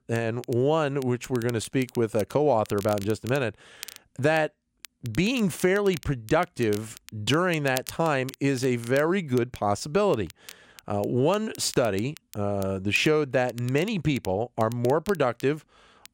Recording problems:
crackle, like an old record; noticeable; 20 dB below the speech

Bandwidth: 16 kHz